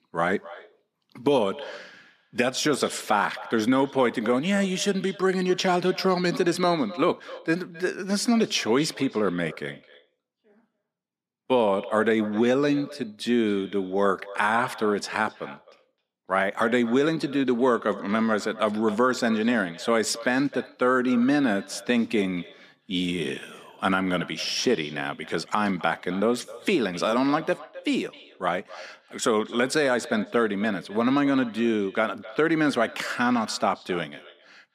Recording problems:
echo of what is said; faint; throughout; 260 ms later, 20 dB below the speech

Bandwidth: 14.5 kHz